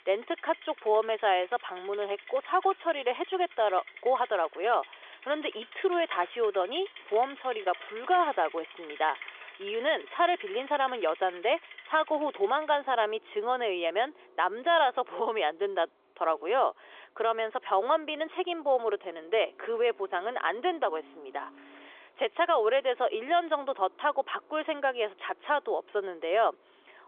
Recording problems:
phone-call audio; nothing above 3.5 kHz
traffic noise; noticeable; throughout; 20 dB below the speech

